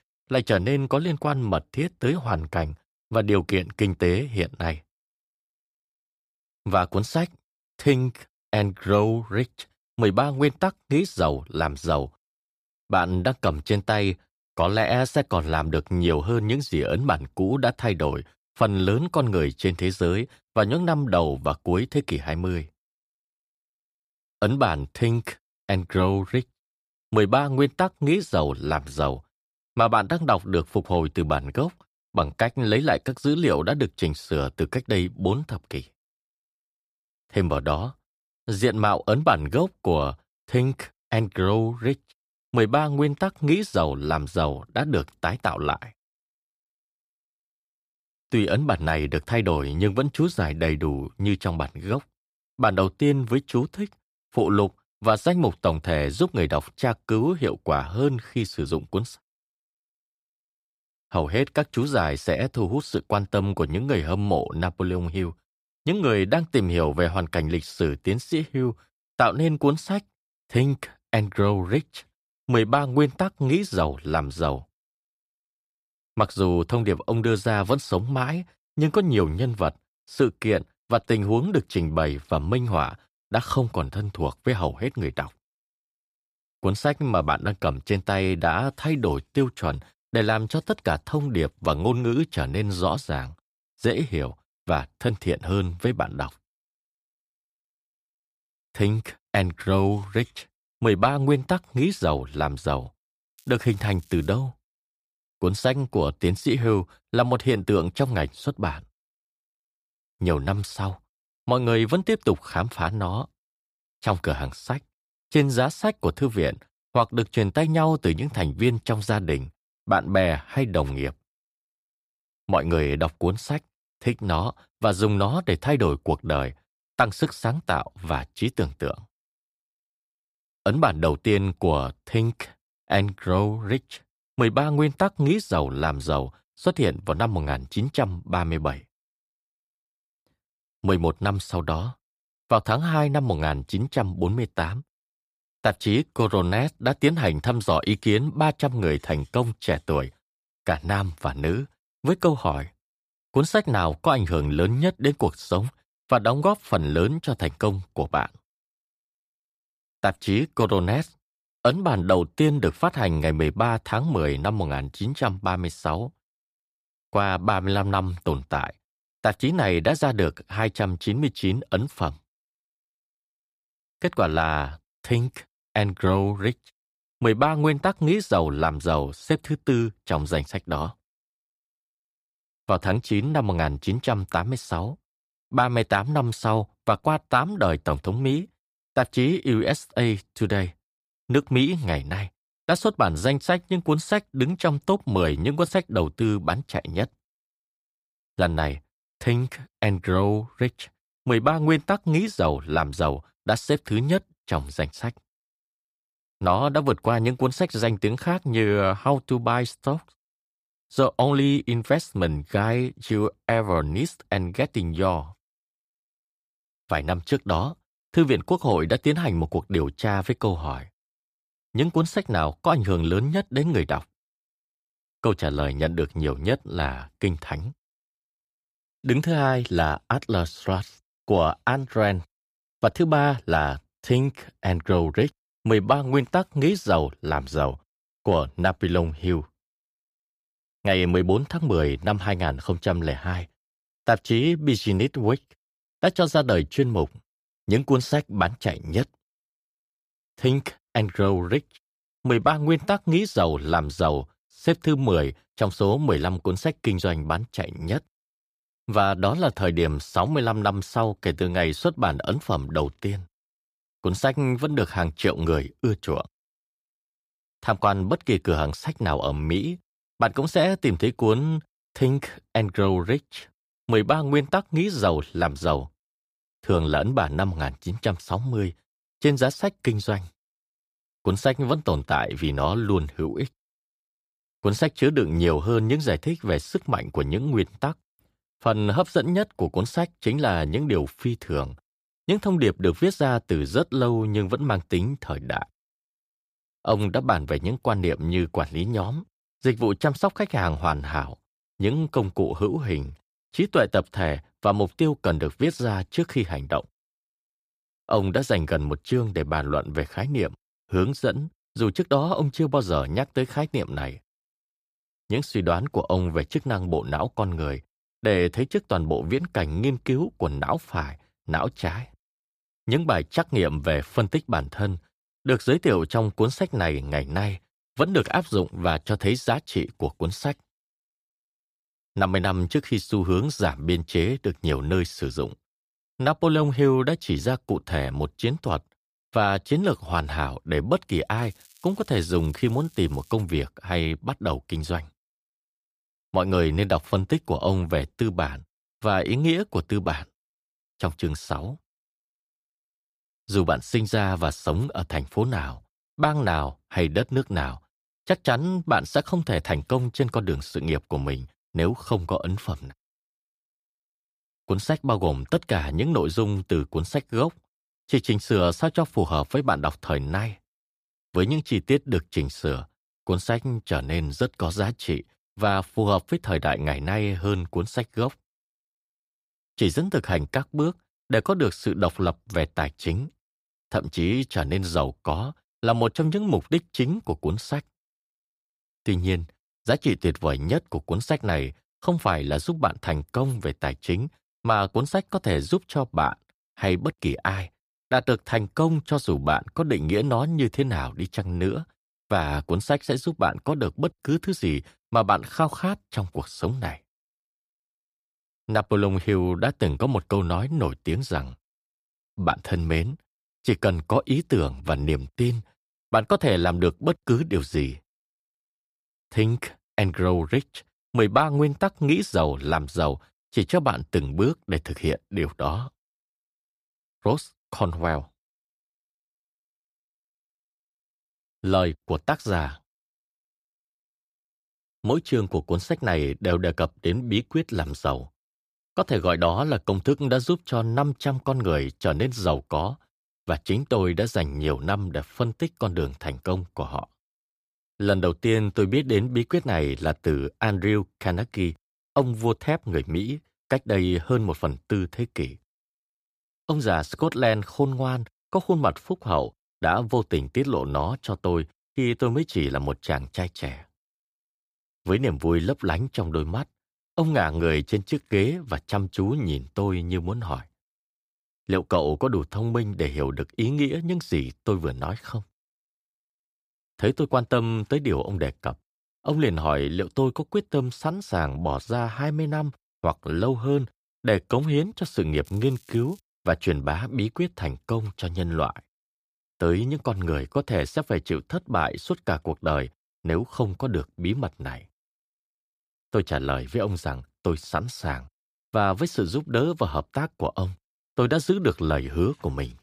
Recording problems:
crackling; faint; at 1:43, from 5:41 to 5:43 and at 8:05; 30 dB below the speech

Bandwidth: 15 kHz